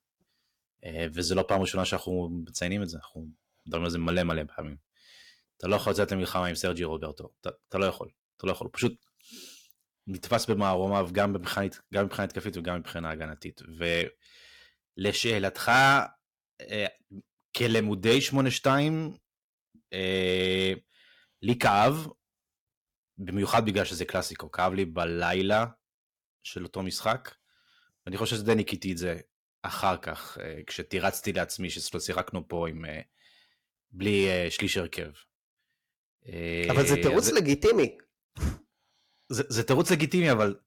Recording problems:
distortion; slight; 1.3% of the sound clipped

